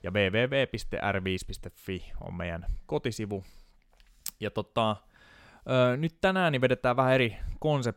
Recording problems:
none

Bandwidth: 16.5 kHz